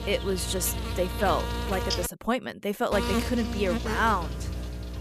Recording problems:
electrical hum; loud; until 2 s and from 3 s on; 60 Hz, 6 dB below the speech

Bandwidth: 14.5 kHz